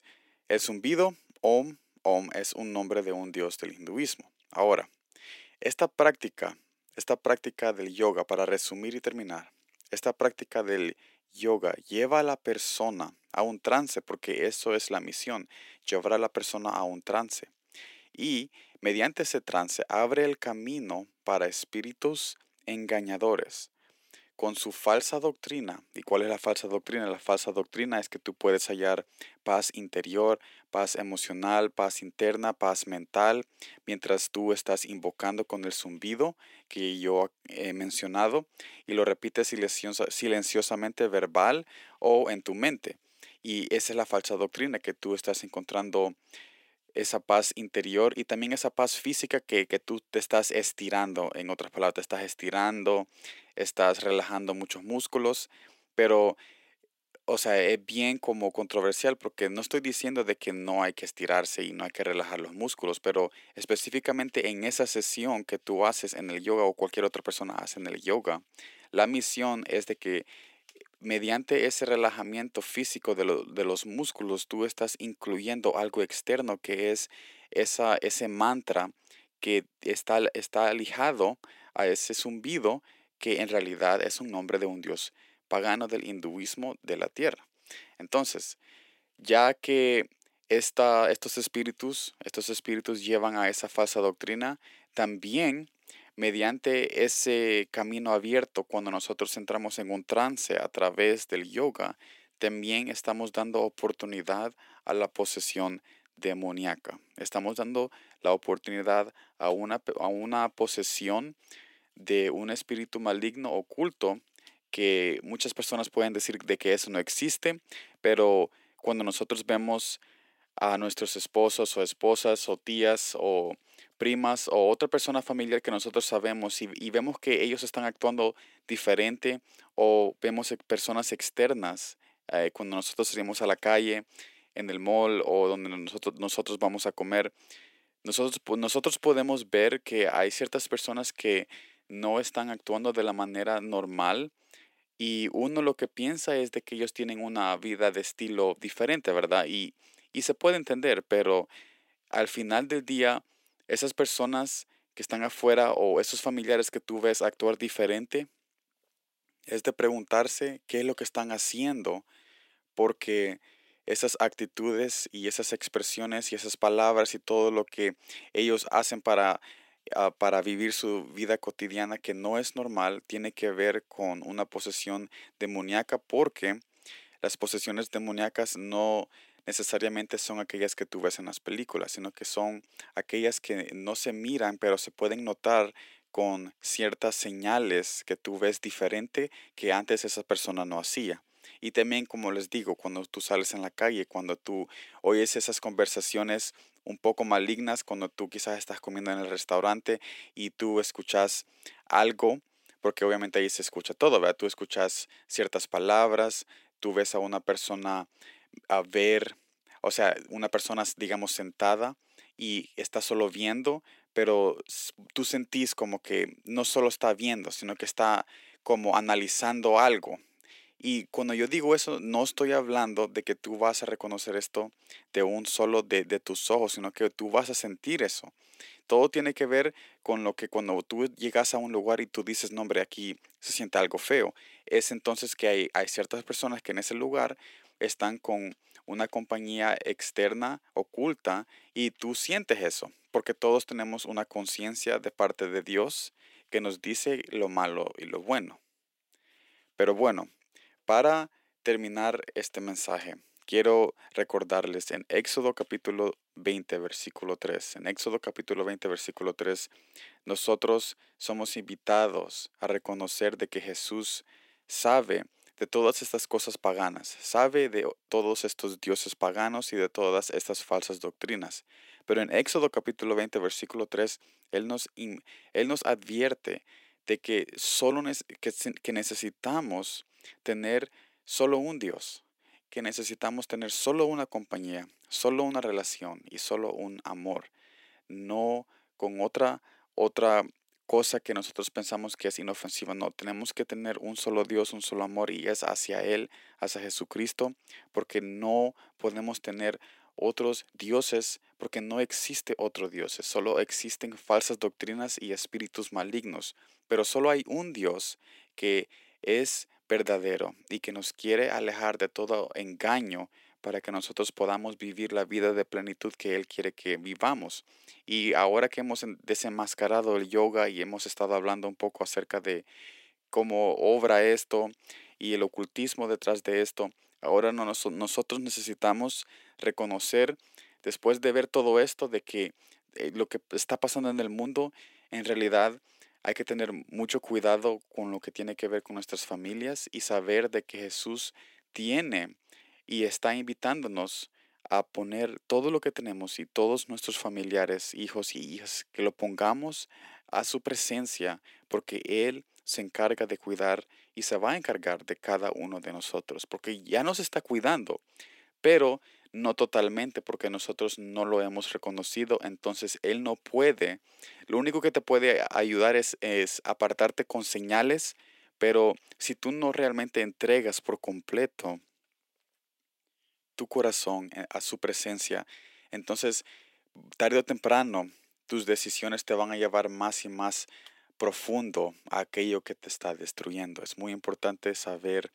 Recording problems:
thin; very; fading below 350 Hz

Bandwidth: 16 kHz